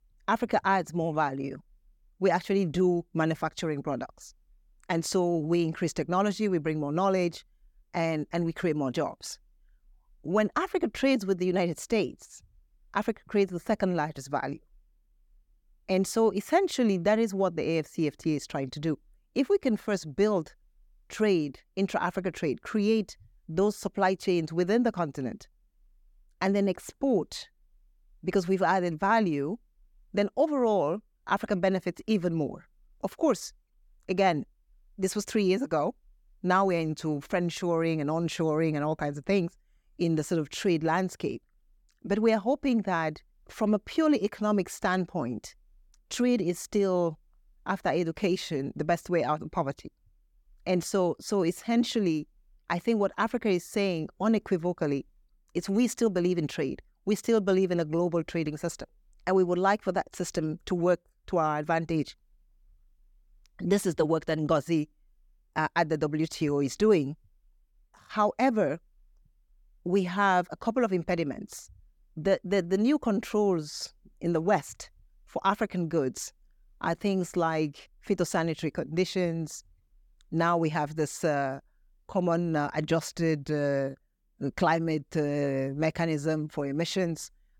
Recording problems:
none

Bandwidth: 18 kHz